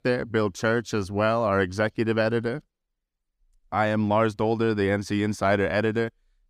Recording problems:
none

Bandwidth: 15.5 kHz